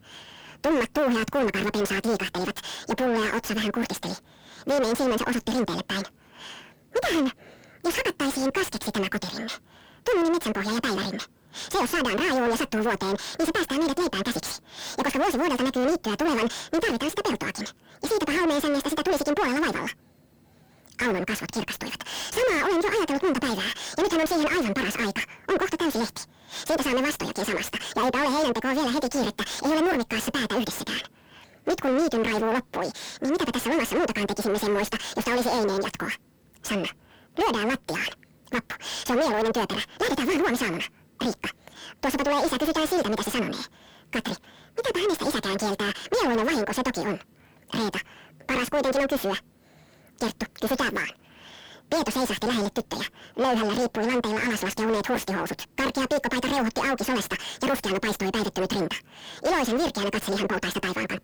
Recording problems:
distortion; heavy; 5 dB below the speech
wrong speed and pitch; too fast and too high; 1.7 times normal speed

